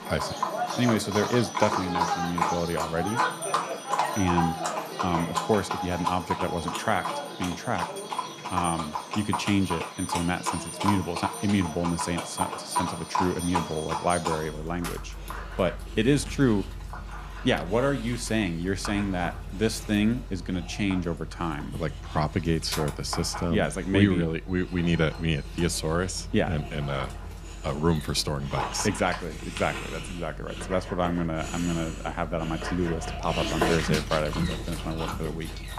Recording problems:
animal sounds; loud; throughout; 4 dB below the speech

